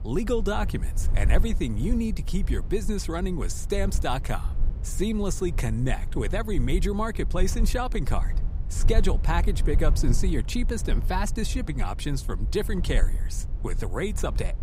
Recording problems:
low rumble; noticeable; throughout; 15 dB below the speech

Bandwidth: 15.5 kHz